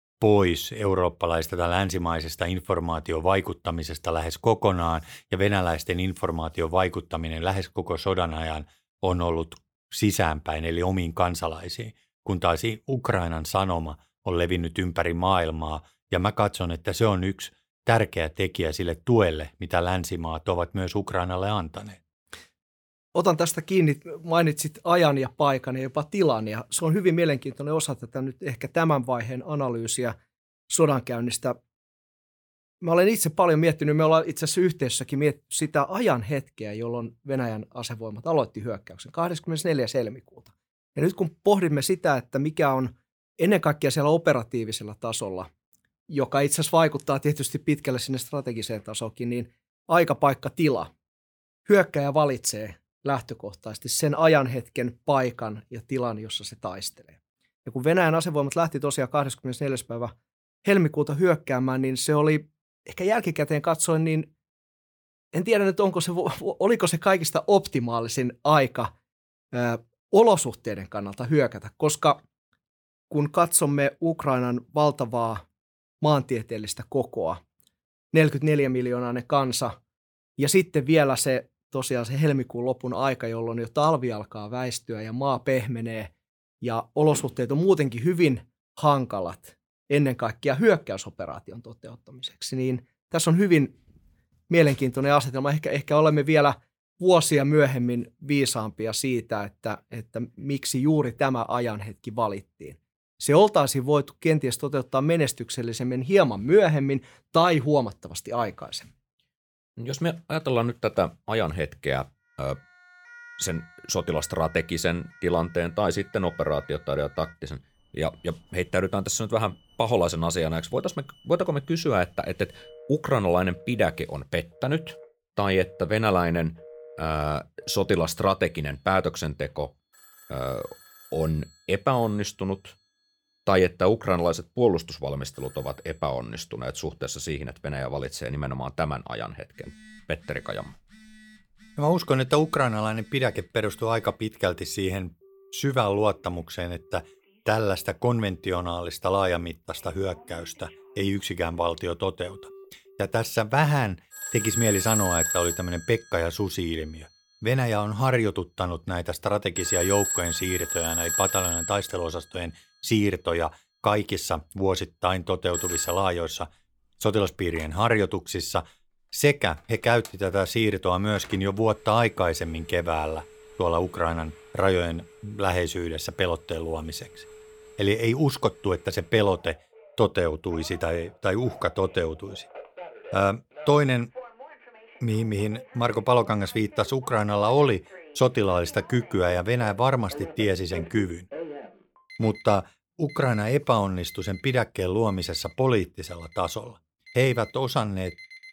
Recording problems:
alarms or sirens; loud; from 1:53 on; 8 dB below the speech

